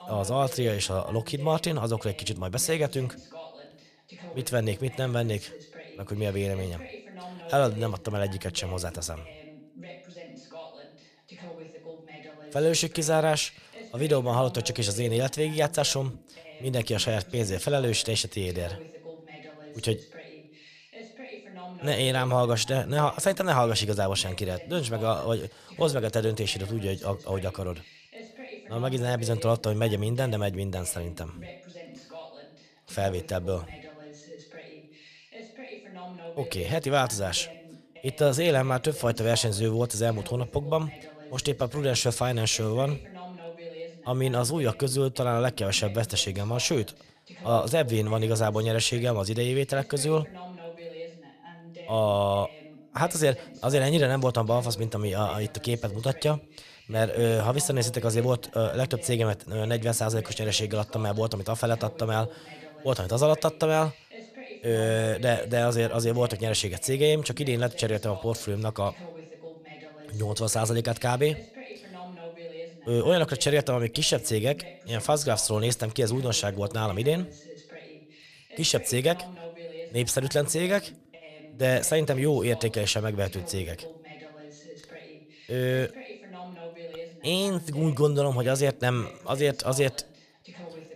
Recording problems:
voice in the background; noticeable; throughout; 20 dB below the speech

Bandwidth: 14.5 kHz